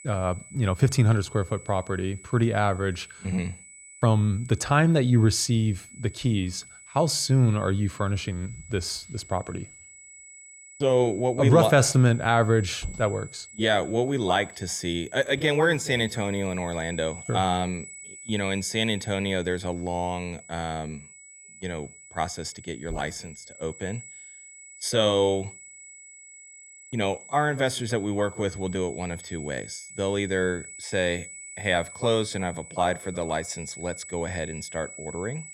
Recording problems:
high-pitched whine; noticeable; throughout; 8 kHz, 15 dB below the speech

